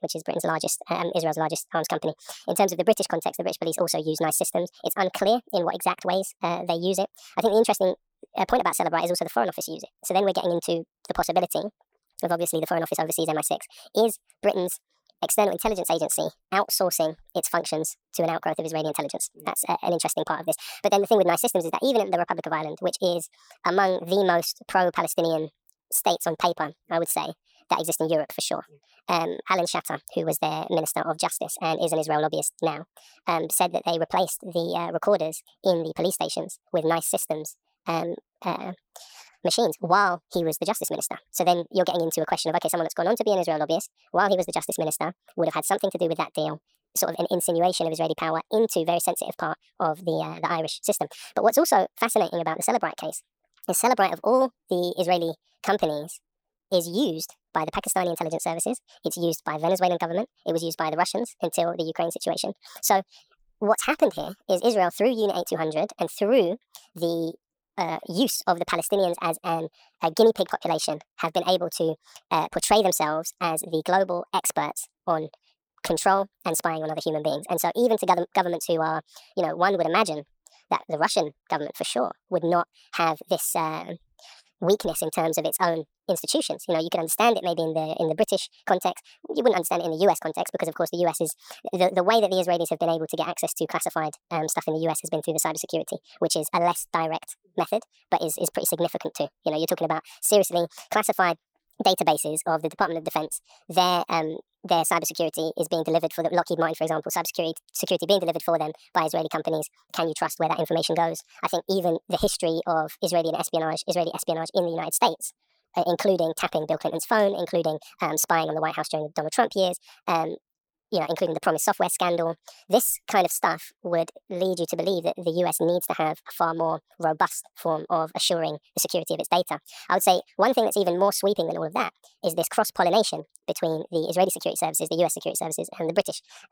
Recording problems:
wrong speed and pitch; too fast and too high; 1.6 times normal speed

